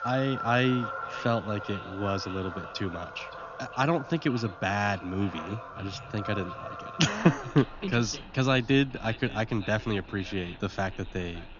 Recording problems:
high frequencies cut off; noticeable; nothing above 7 kHz
echo of what is said; faint; throughout; 570 ms later, 20 dB below the speech
animal sounds; noticeable; throughout; 10 dB below the speech

